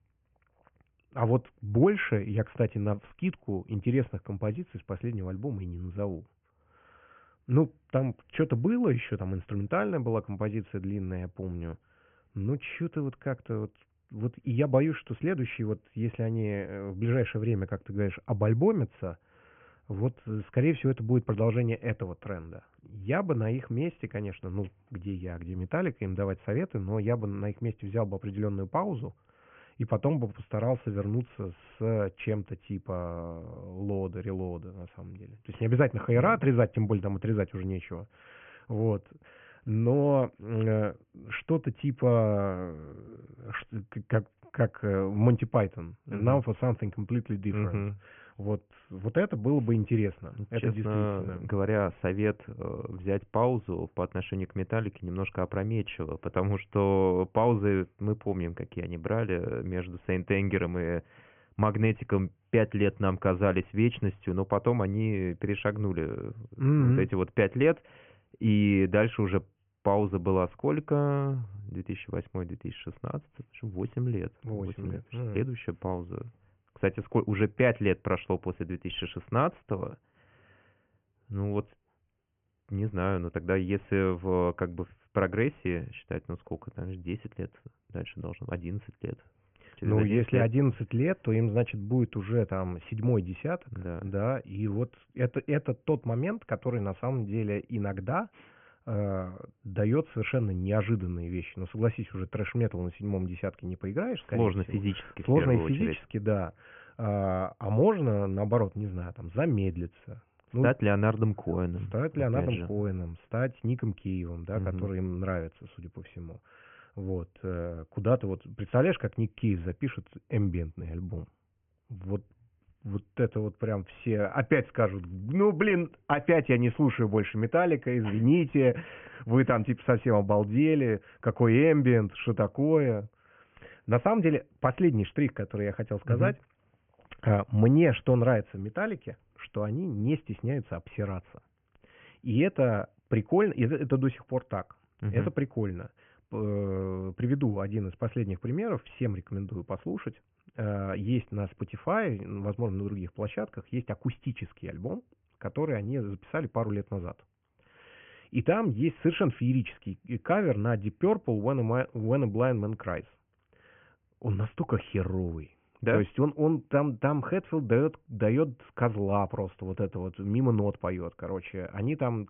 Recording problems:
high frequencies cut off; severe; nothing above 3 kHz

